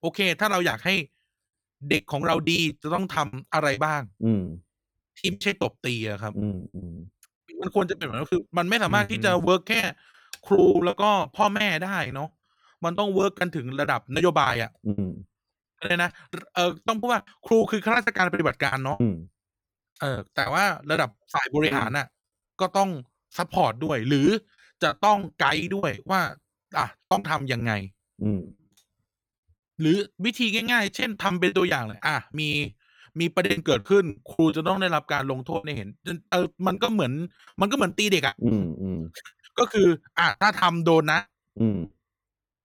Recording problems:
choppy; very; 12% of the speech affected

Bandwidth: 17 kHz